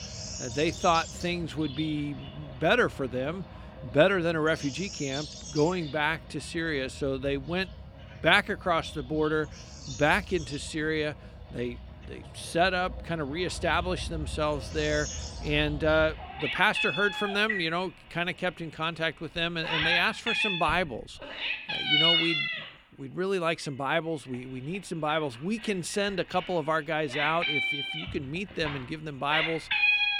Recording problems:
animal sounds; loud; throughout; 2 dB below the speech

